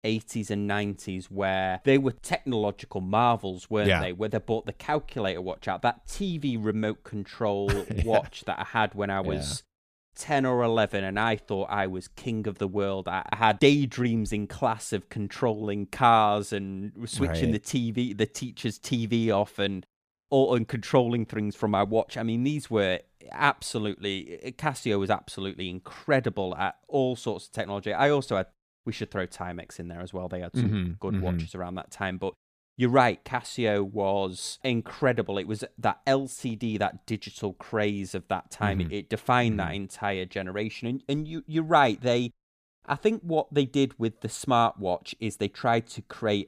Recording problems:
none

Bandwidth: 14.5 kHz